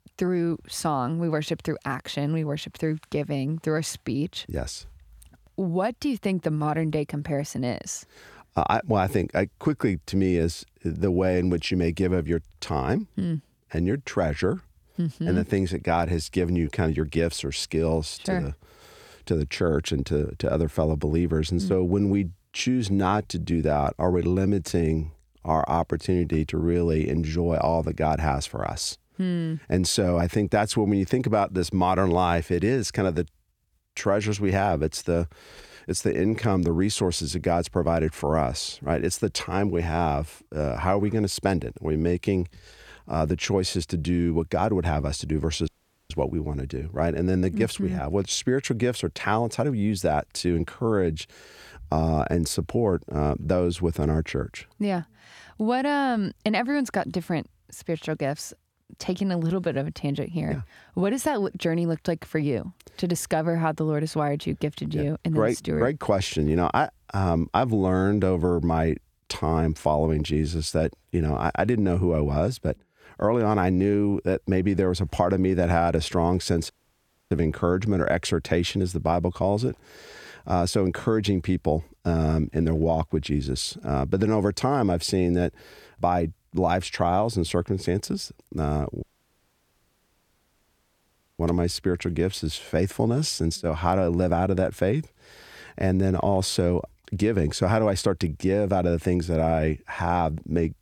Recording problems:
audio cutting out; at 46 s, at 1:17 for 0.5 s and at 1:29 for 2.5 s

